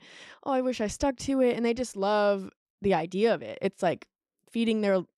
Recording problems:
none

